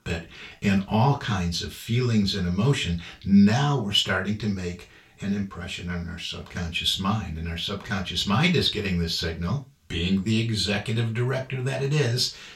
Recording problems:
off-mic speech; far
room echo; very slight; dies away in 0.3 s

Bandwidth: 16.5 kHz